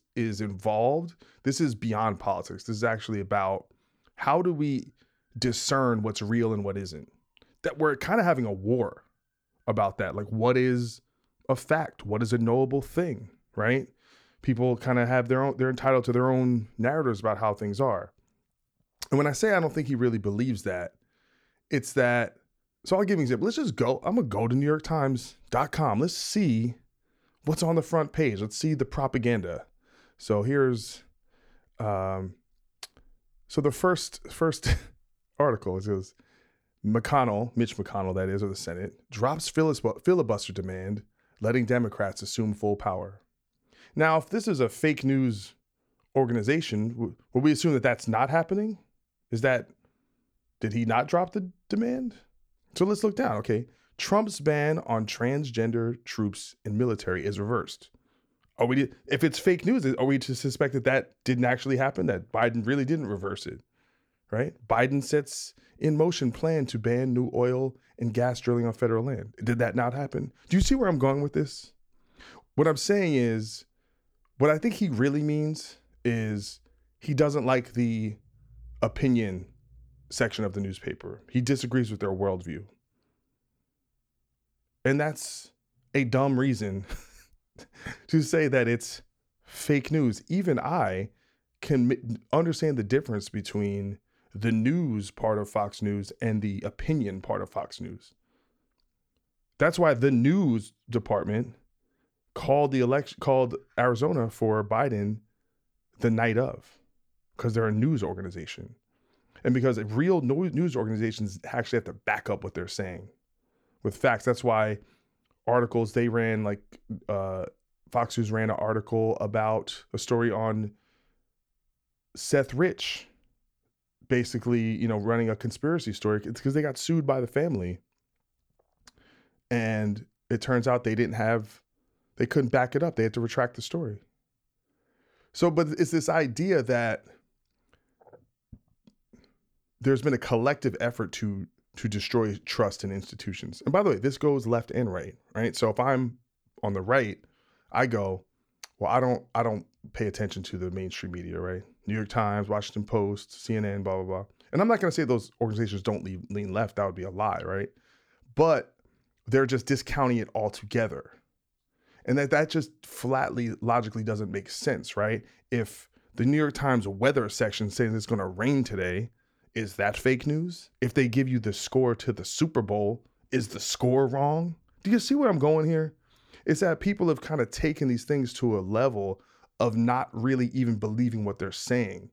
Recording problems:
none

